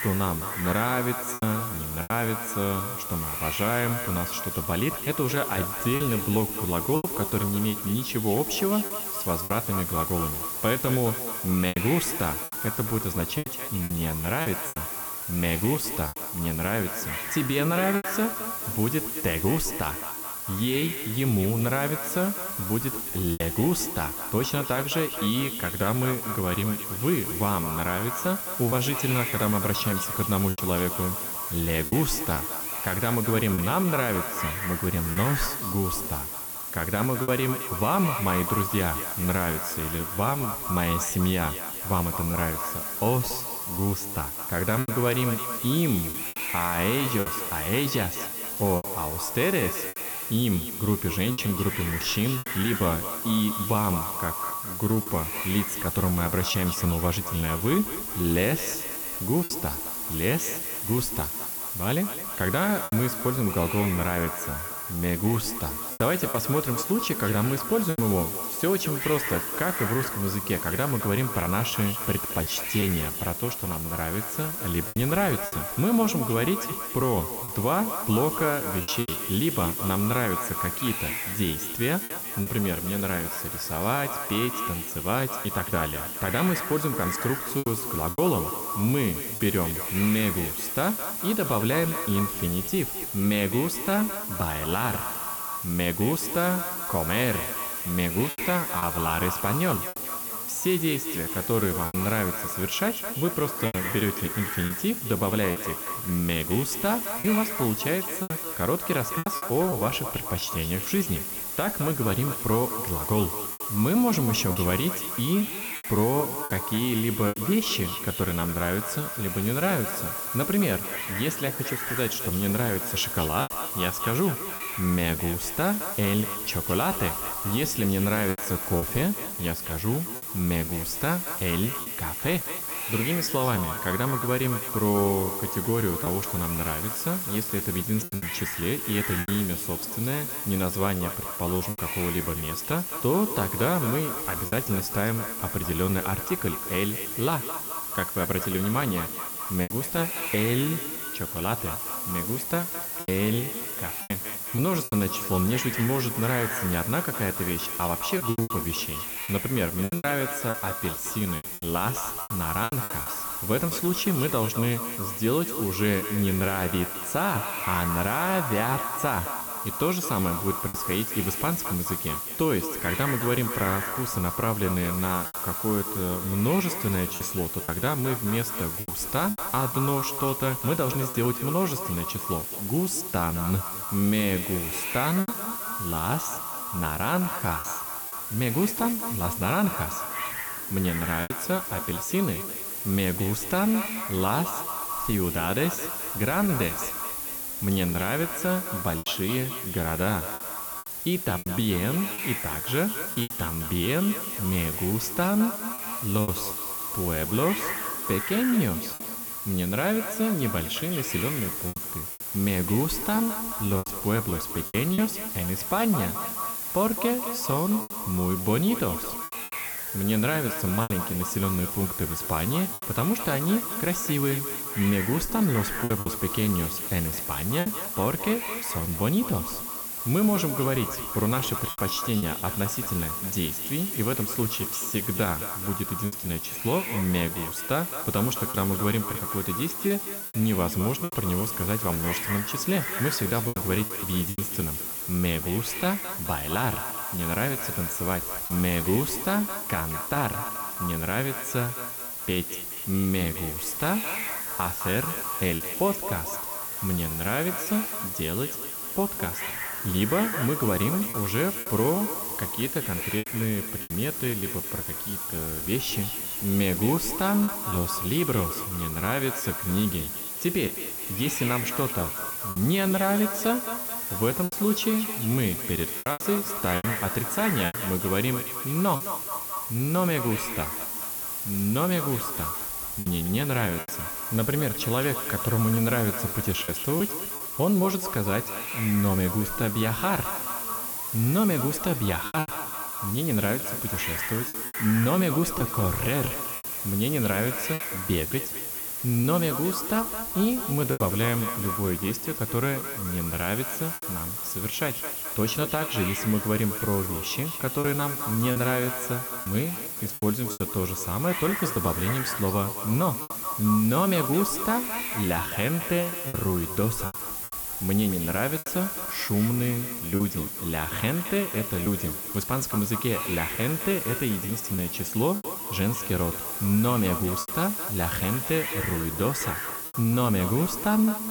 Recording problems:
echo of what is said; strong; throughout; 210 ms later, 10 dB below the speech
hiss; loud; throughout; 2 dB below the speech
choppy; occasionally; 3% of the speech affected

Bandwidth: 18.5 kHz